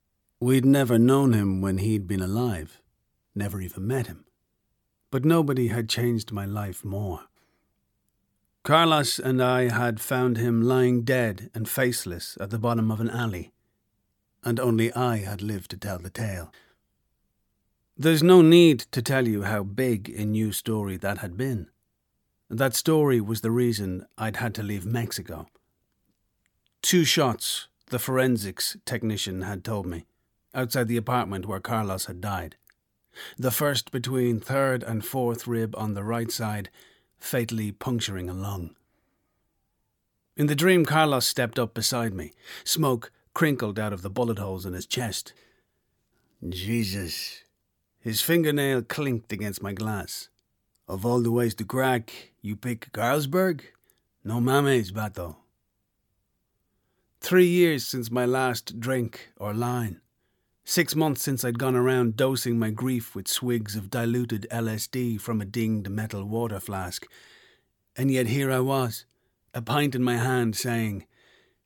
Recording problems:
none

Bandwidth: 17.5 kHz